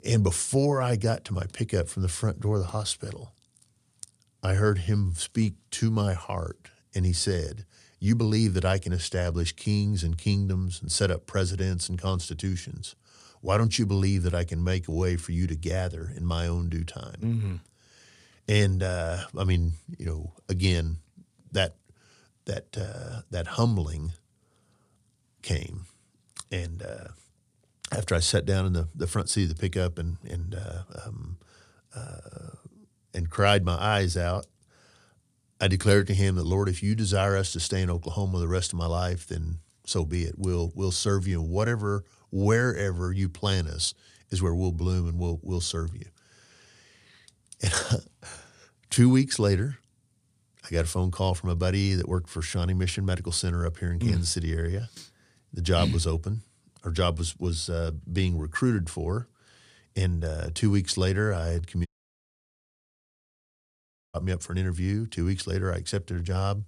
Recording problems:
audio cutting out; at 1:02 for 2.5 s

